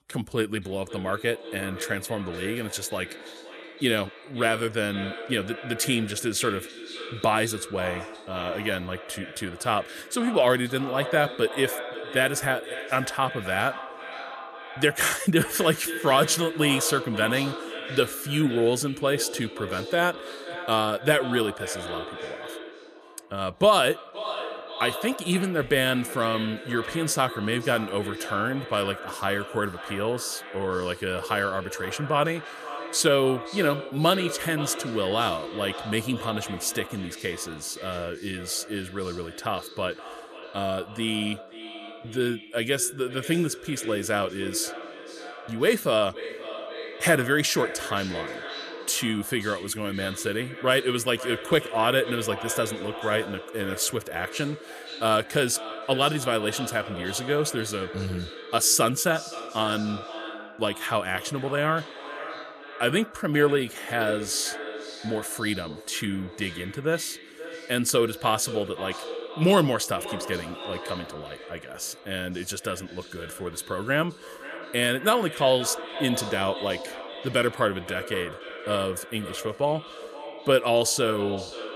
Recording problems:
echo of what is said; strong; throughout; 520 ms later, 10 dB below the speech

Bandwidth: 14.5 kHz